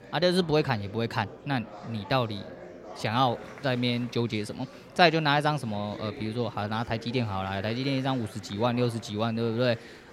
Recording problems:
murmuring crowd; noticeable; throughout; 15 dB below the speech

